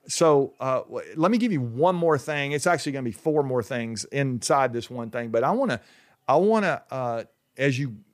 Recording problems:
none

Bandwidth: 15 kHz